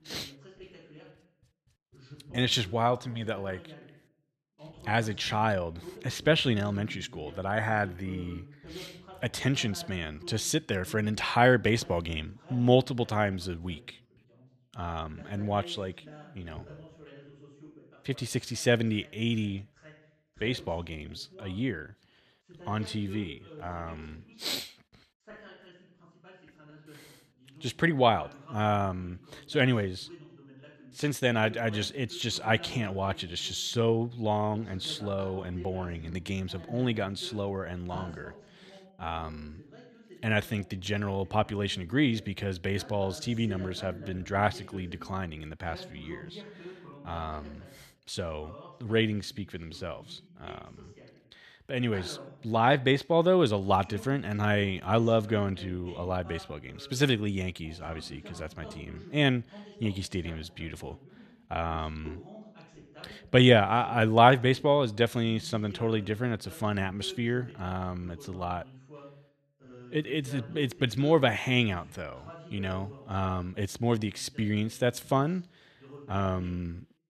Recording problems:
voice in the background; faint; throughout; 20 dB below the speech

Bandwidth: 14.5 kHz